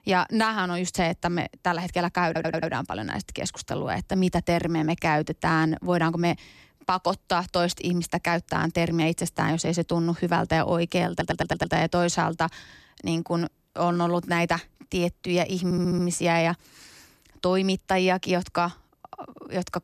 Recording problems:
audio stuttering; at 2.5 s, at 11 s and at 16 s

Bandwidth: 14 kHz